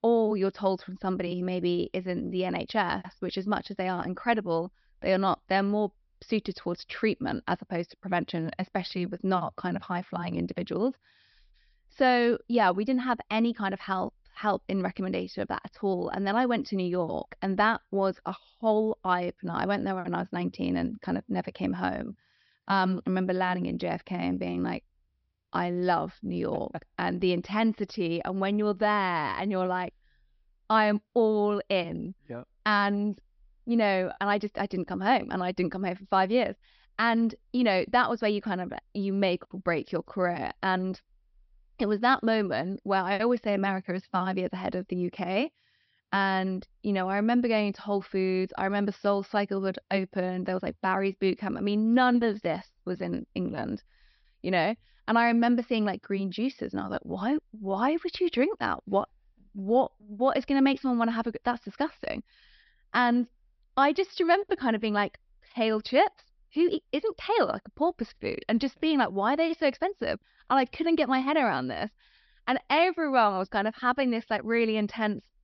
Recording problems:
high frequencies cut off; noticeable; nothing above 5.5 kHz

